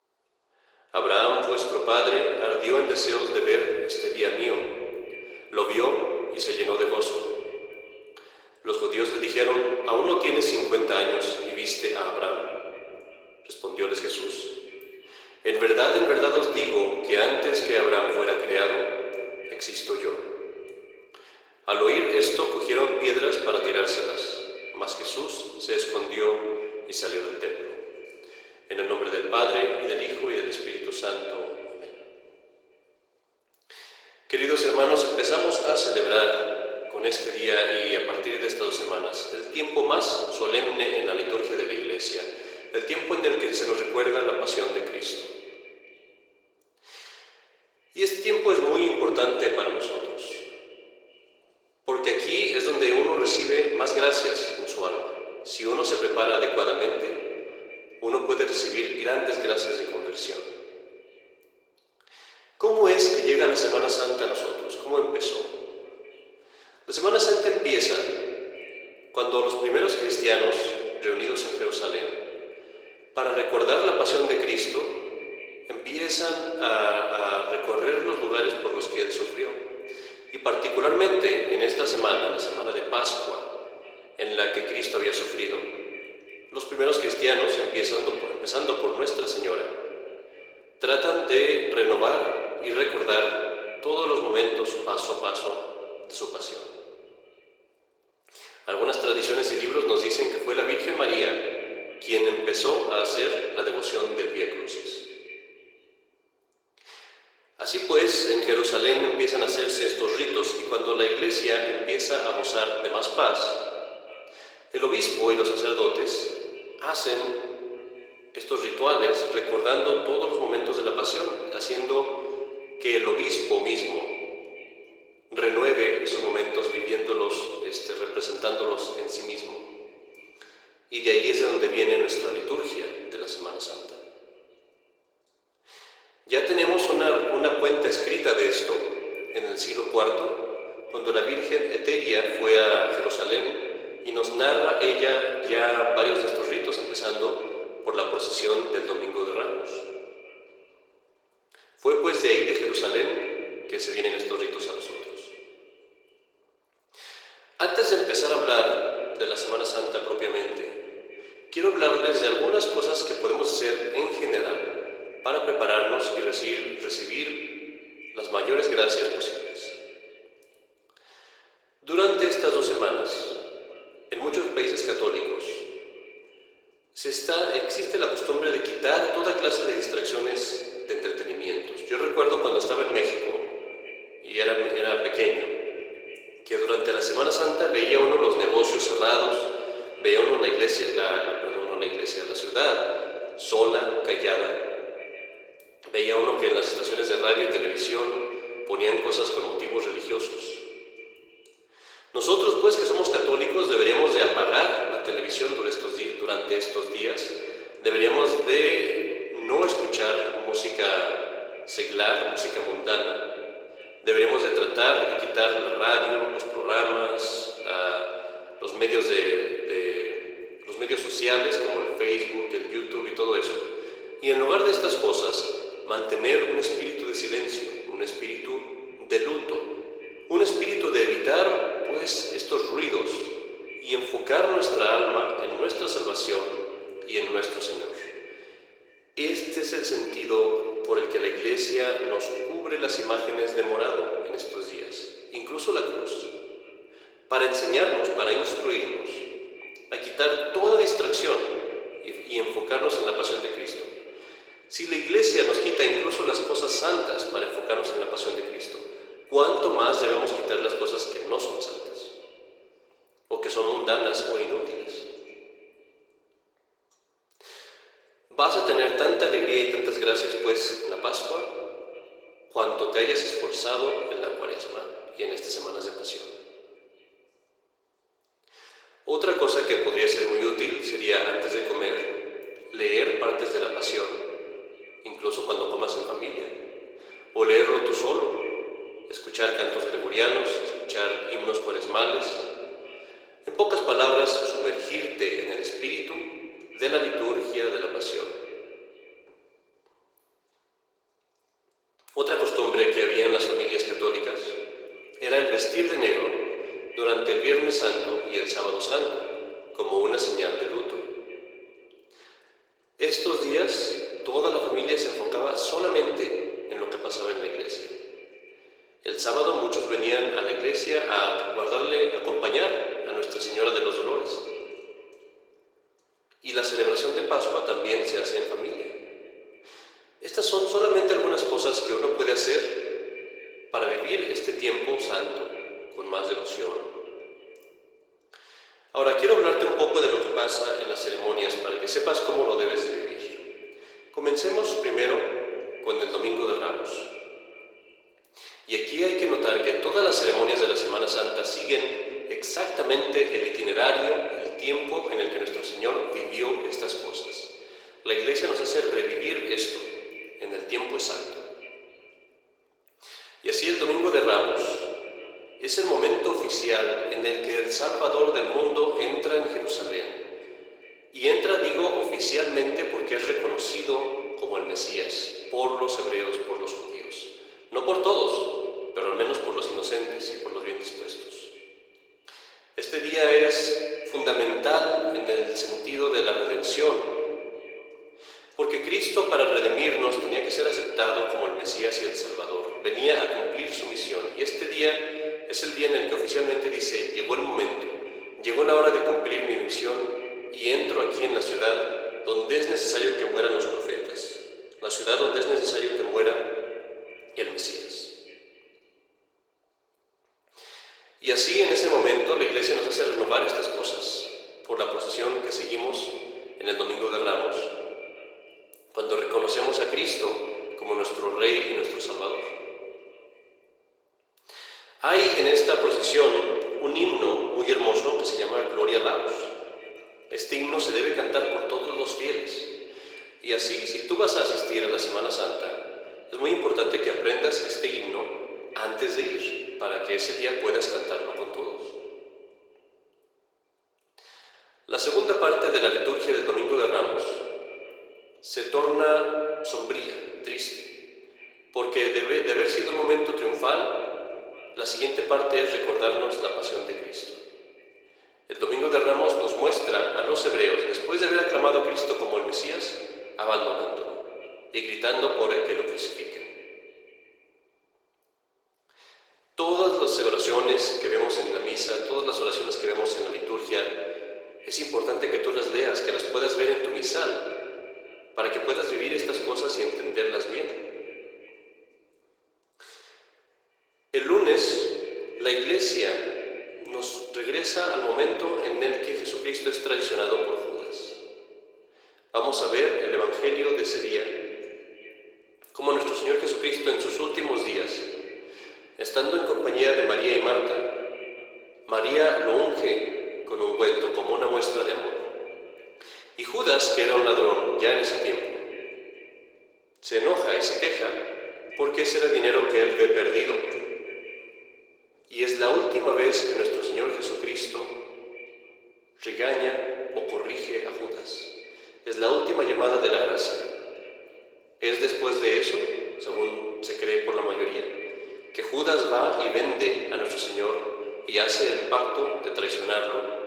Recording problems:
thin; very; fading below 400 Hz
room echo; noticeable; dies away in 1.7 s
echo of what is said; faint; throughout; 440 ms later, 20 dB below the speech
off-mic speech; somewhat distant
garbled, watery; slightly; nothing above 19 kHz

